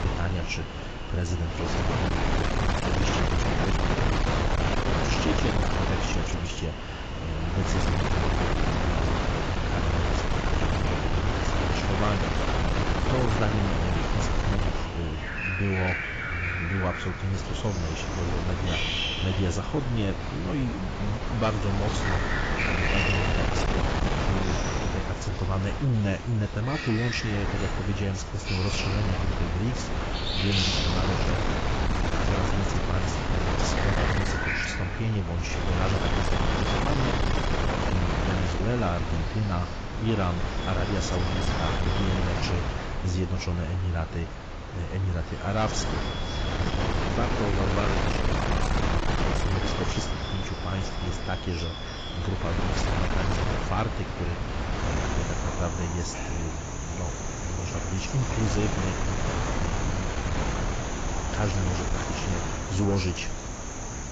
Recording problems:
garbled, watery; badly; nothing above 7.5 kHz
distortion; slight; 10 dB below the speech
wind noise on the microphone; heavy; 3 dB above the speech
animal sounds; loud; throughout; 5 dB below the speech

